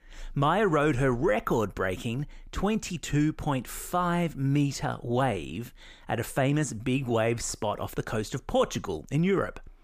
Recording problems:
none

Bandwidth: 15 kHz